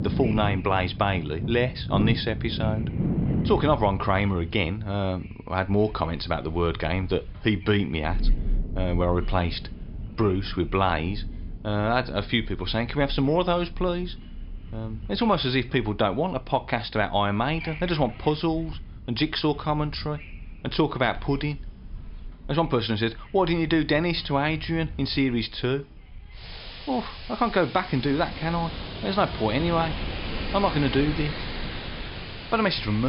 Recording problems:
high frequencies cut off; noticeable; nothing above 5.5 kHz
rain or running water; loud; throughout; 8 dB below the speech
wind noise on the microphone; occasional gusts; 20 dB below the speech
abrupt cut into speech; at the end

